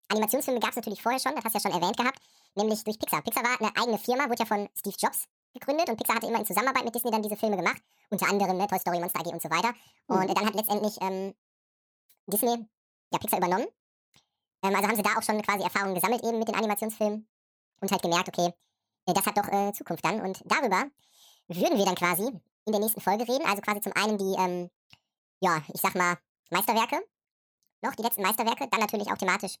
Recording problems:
wrong speed and pitch; too fast and too high; 1.7 times normal speed

